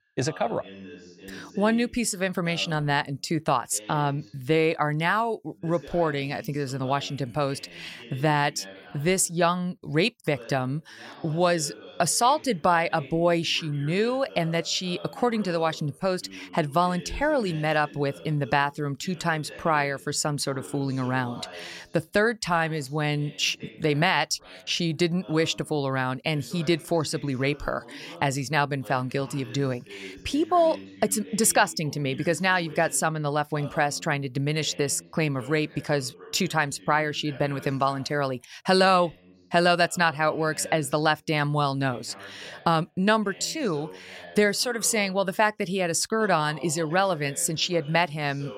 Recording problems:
voice in the background; noticeable; throughout; 20 dB below the speech

